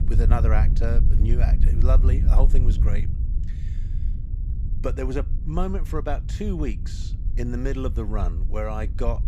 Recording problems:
low rumble; loud; throughout; 10 dB below the speech

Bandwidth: 15 kHz